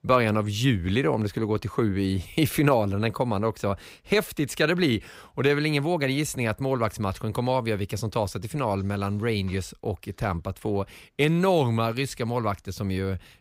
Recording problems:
none

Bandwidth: 15.5 kHz